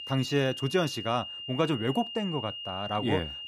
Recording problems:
high-pitched whine; loud; throughout; 3 kHz, 7 dB below the speech

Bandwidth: 15 kHz